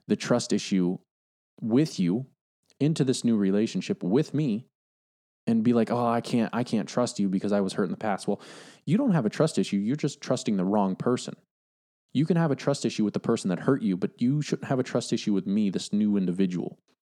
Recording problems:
none

